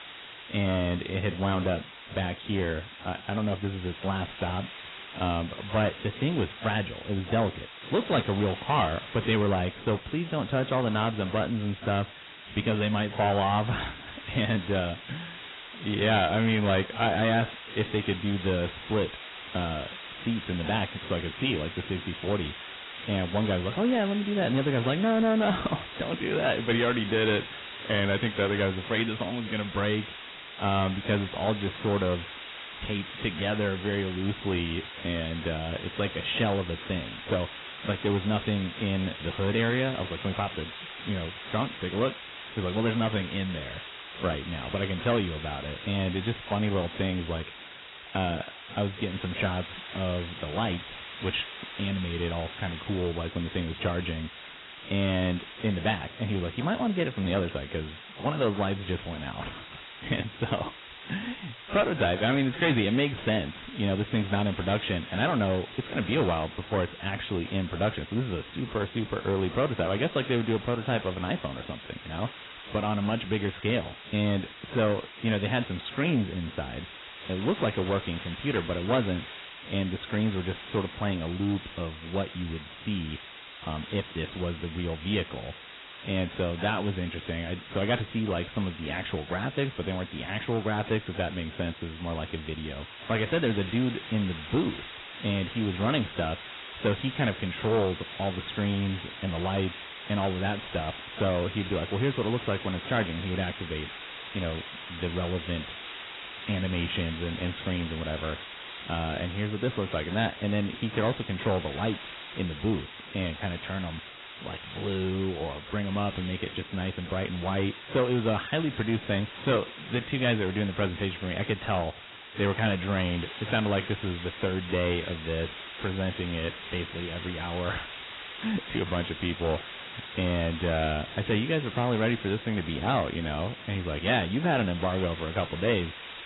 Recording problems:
garbled, watery; badly; nothing above 4 kHz
distortion; slight; 6% of the sound clipped
hiss; noticeable; throughout; 10 dB below the speech

